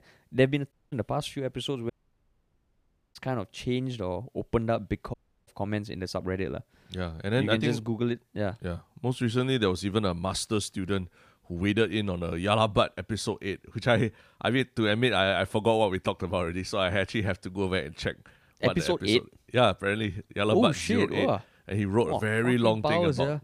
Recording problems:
audio cutting out; at 0.5 s, at 2 s for 1.5 s and at 5 s

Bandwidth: 15 kHz